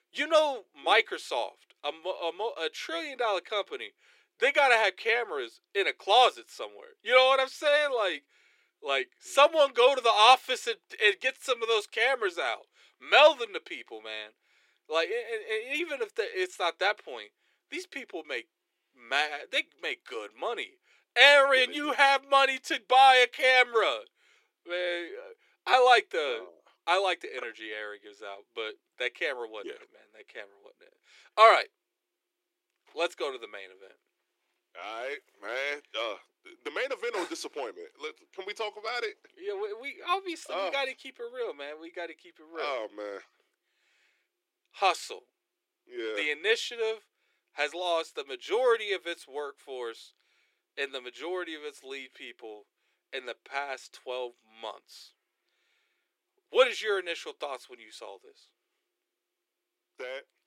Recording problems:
thin; very; fading below 350 Hz

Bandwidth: 16 kHz